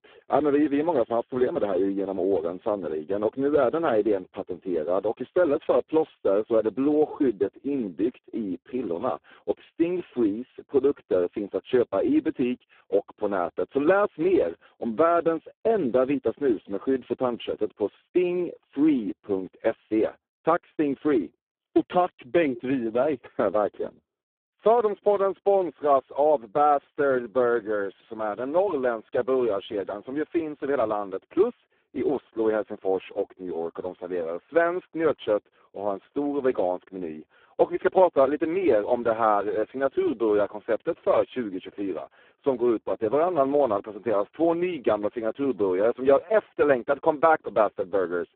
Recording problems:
phone-call audio; poor line; nothing above 3.5 kHz

